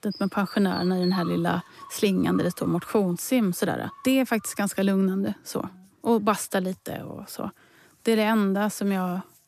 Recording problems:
animal sounds; noticeable; throughout; 15 dB below the speech

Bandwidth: 14.5 kHz